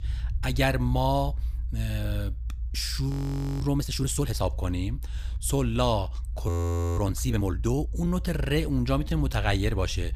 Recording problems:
low rumble; faint; throughout; 20 dB below the speech
audio freezing; at 3 s for 0.5 s and at 6.5 s

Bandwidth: 15 kHz